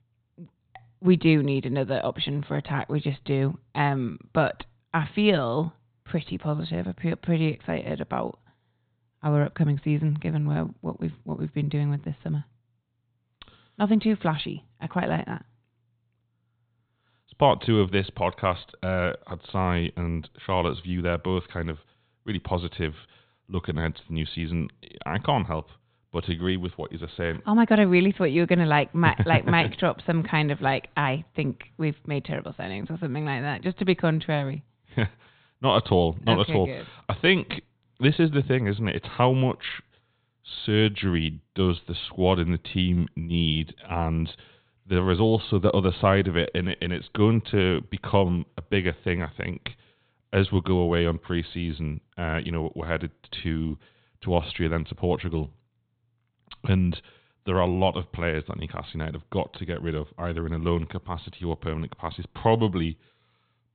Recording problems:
high frequencies cut off; severe; nothing above 4 kHz

